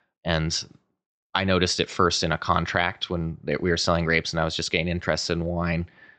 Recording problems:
high frequencies cut off; noticeable; nothing above 8 kHz

